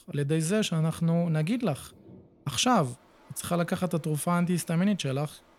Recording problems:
rain or running water; faint; throughout; 30 dB below the speech

